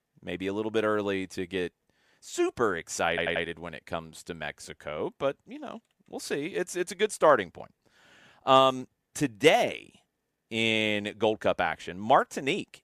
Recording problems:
audio stuttering; at 3 s

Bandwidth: 14.5 kHz